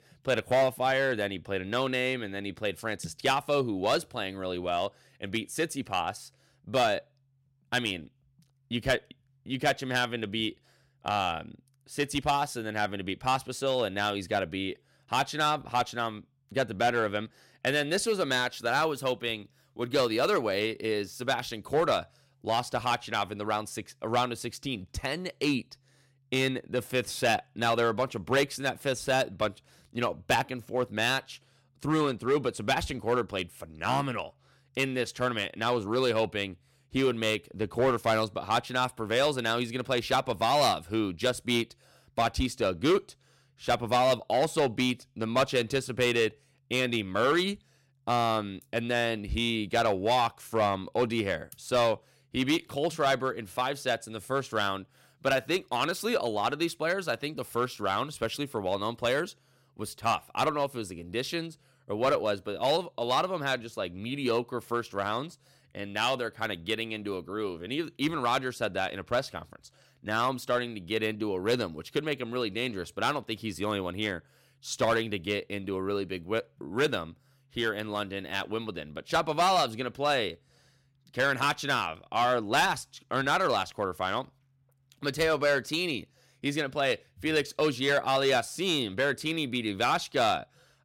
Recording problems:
distortion; slight; 3% of the sound clipped

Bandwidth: 16 kHz